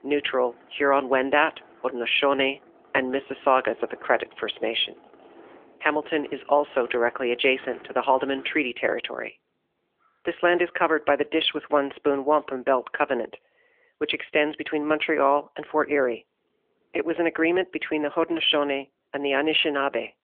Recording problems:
phone-call audio; nothing above 3.5 kHz
traffic noise; faint; throughout; 25 dB below the speech

